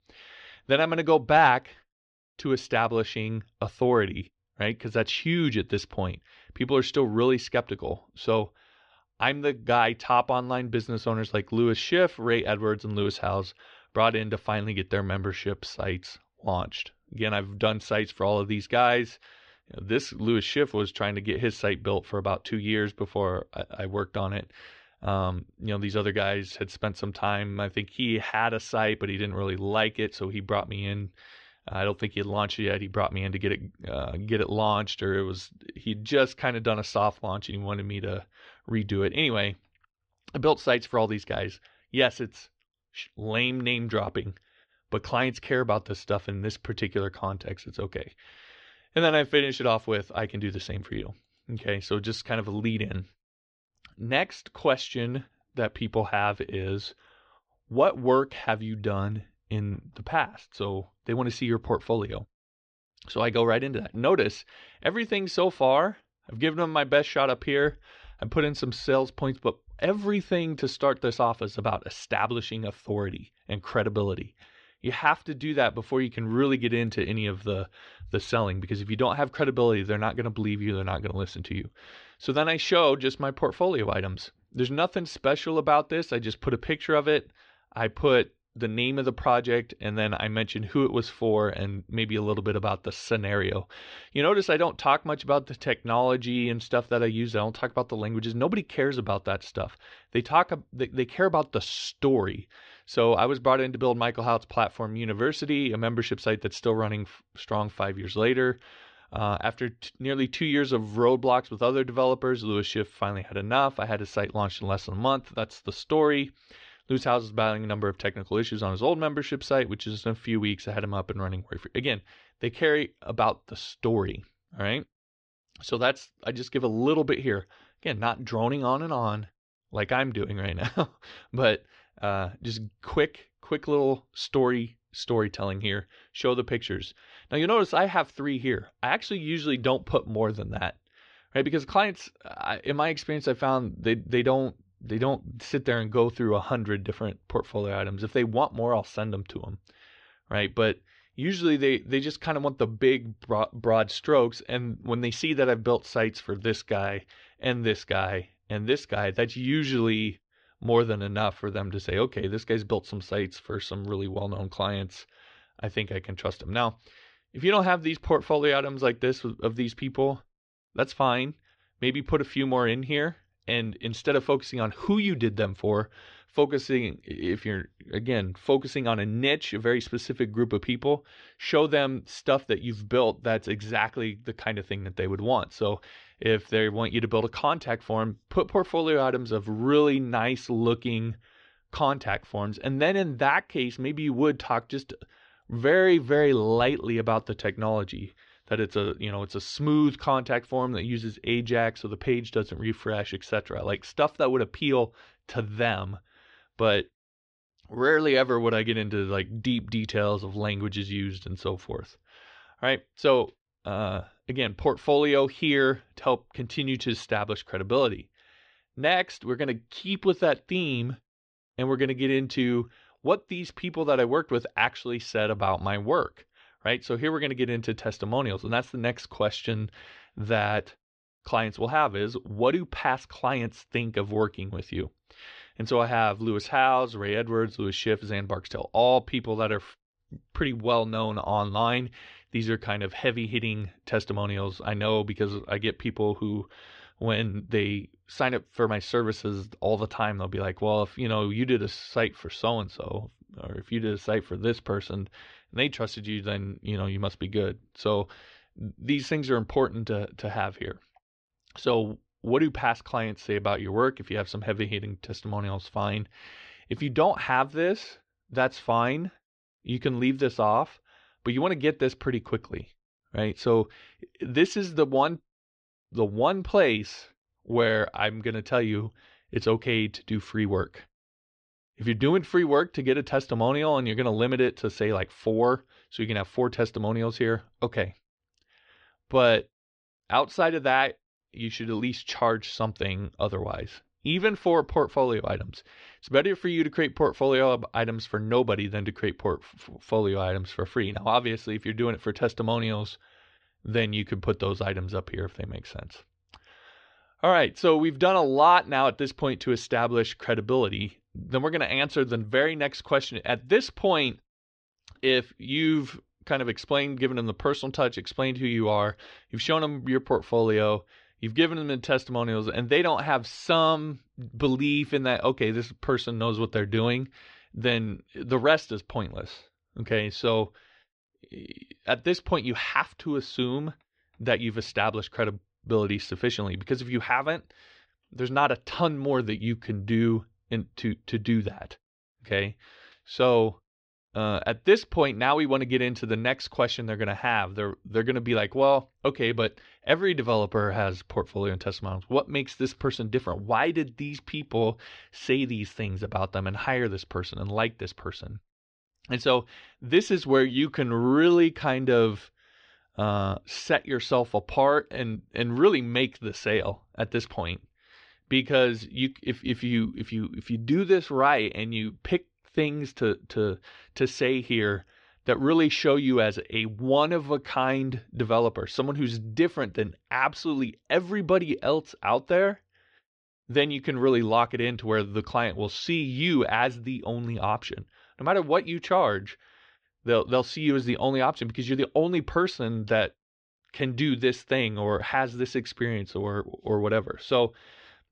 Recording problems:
muffled; slightly; fading above 4 kHz

